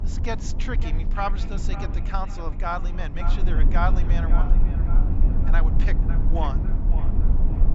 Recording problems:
echo of what is said; strong; throughout; 550 ms later, 10 dB below the speech
high frequencies cut off; noticeable; nothing above 8 kHz
low rumble; loud; throughout; 8 dB below the speech

